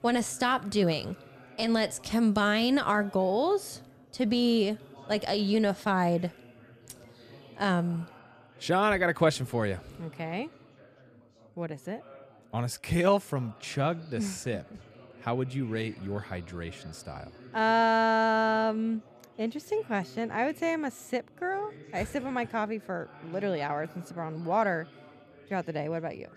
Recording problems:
background chatter; faint; throughout; 4 voices, 25 dB below the speech

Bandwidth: 14.5 kHz